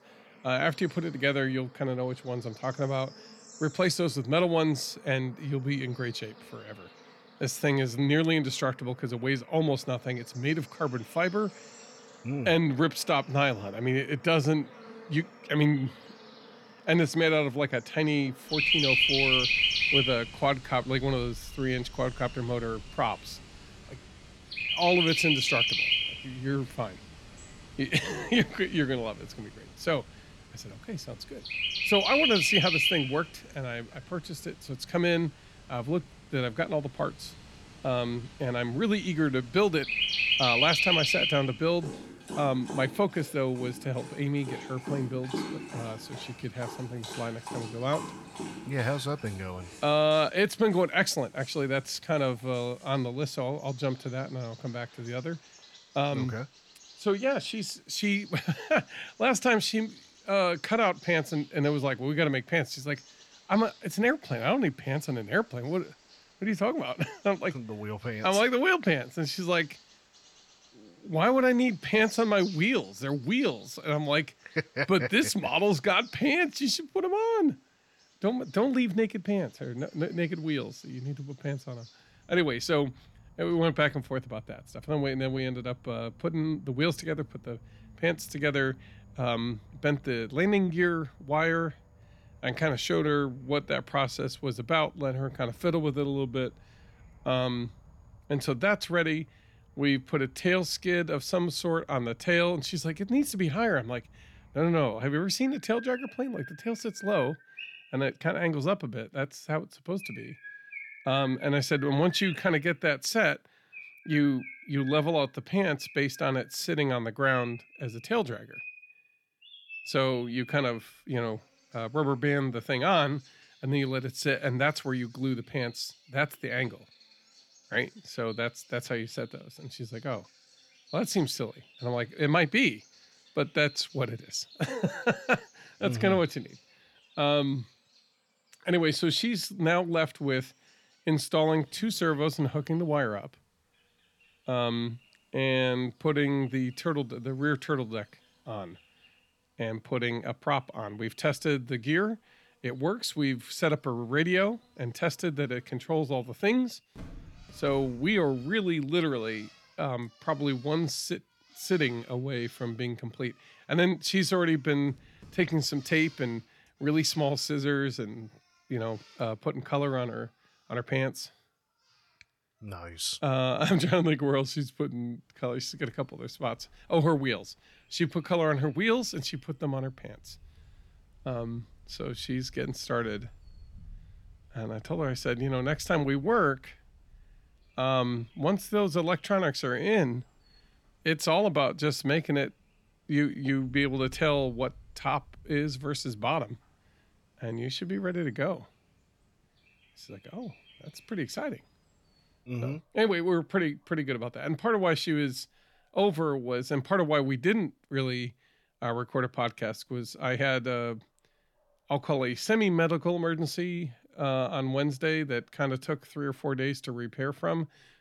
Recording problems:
animal sounds; loud; throughout; 1 dB below the speech

